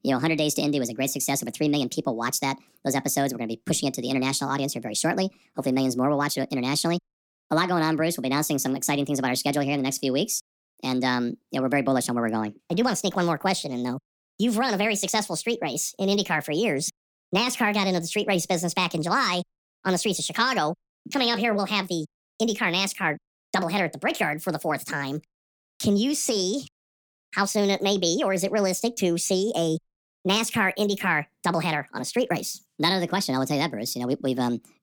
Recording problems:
wrong speed and pitch; too fast and too high; 1.5 times normal speed

